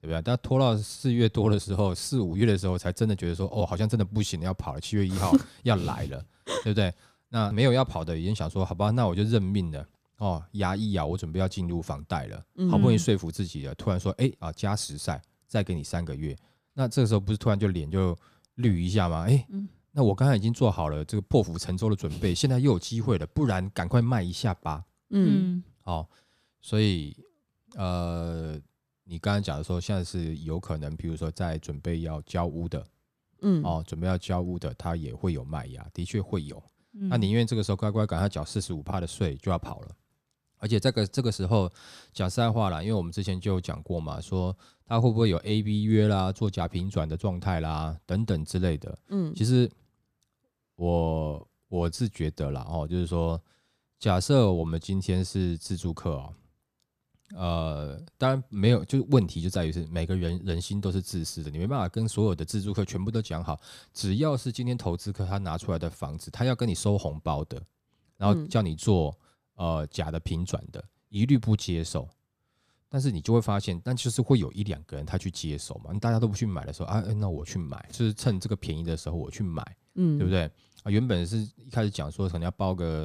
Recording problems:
abrupt cut into speech; at the end

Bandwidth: 14.5 kHz